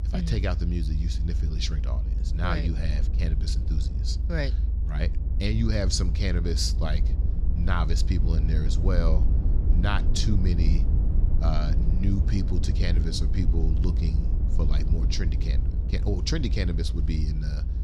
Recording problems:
low rumble; loud; throughout; 9 dB below the speech

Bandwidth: 14.5 kHz